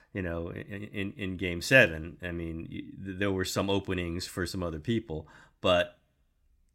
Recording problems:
none

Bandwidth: 16 kHz